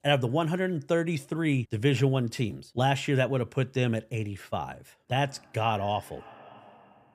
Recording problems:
echo of what is said; faint; from 5 s on; 560 ms later, 25 dB below the speech

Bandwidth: 15 kHz